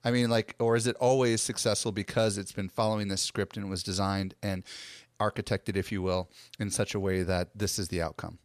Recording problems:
none

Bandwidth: 14 kHz